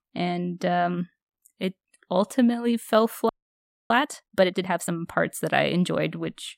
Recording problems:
audio freezing; at 3.5 s for 0.5 s

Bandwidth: 16 kHz